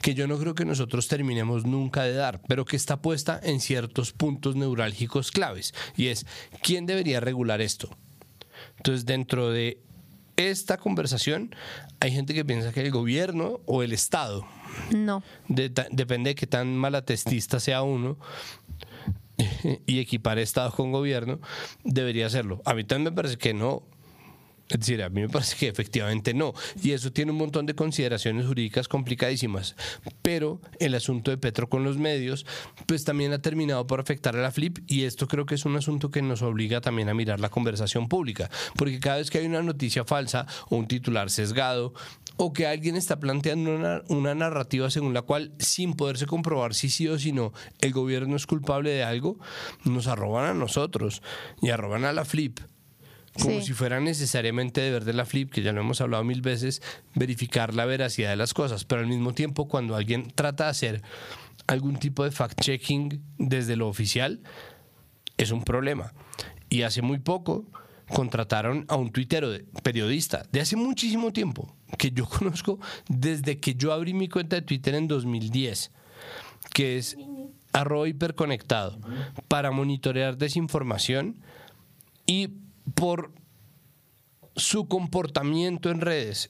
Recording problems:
squashed, flat; somewhat

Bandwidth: 15 kHz